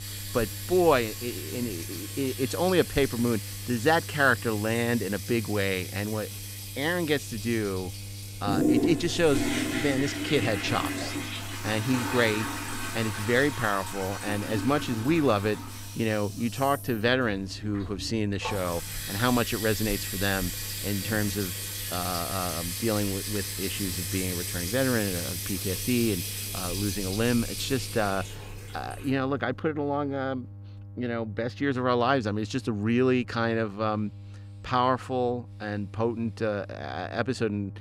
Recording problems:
household noises; loud; until 30 s; 5 dB below the speech
electrical hum; faint; throughout; 50 Hz, 25 dB below the speech

